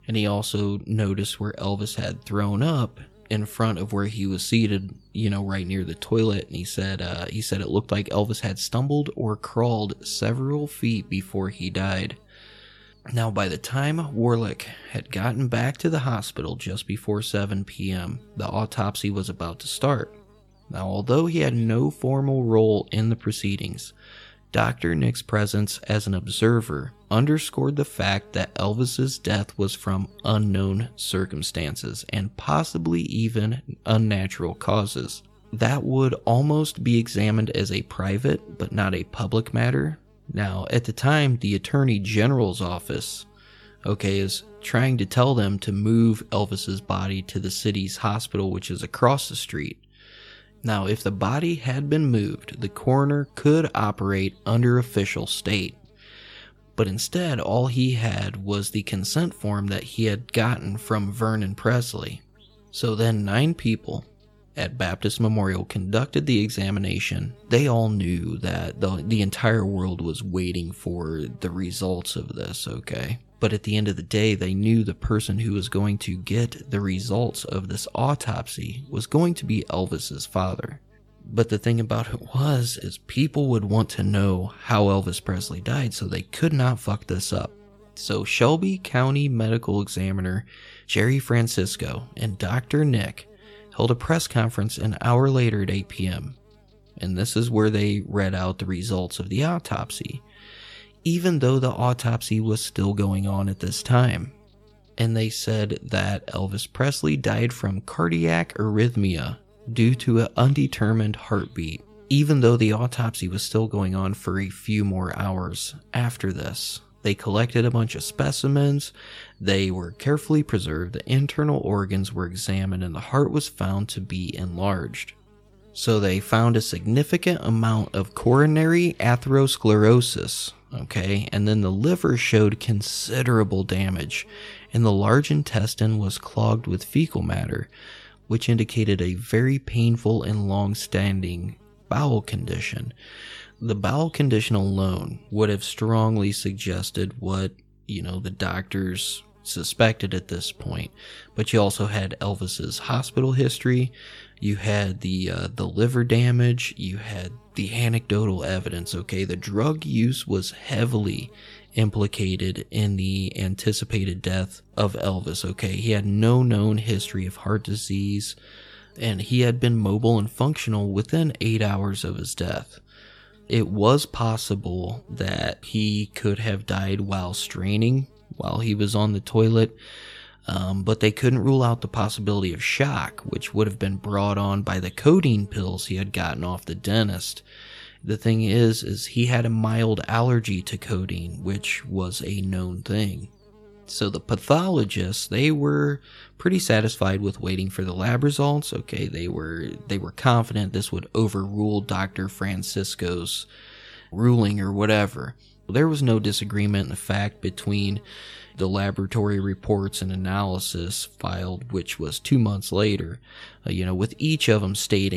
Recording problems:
electrical hum; faint; throughout; 50 Hz, 30 dB below the speech
abrupt cut into speech; at the end

